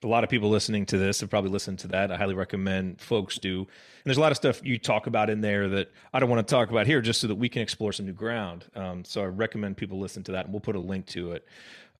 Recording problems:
uneven, jittery; strongly; from 1.5 to 11 s

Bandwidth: 13.5 kHz